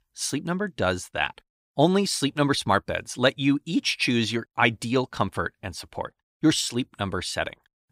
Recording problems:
none

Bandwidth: 15.5 kHz